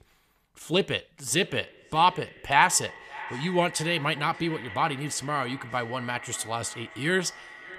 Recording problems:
echo of what is said; noticeable; throughout; 580 ms later, 15 dB below the speech

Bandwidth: 14.5 kHz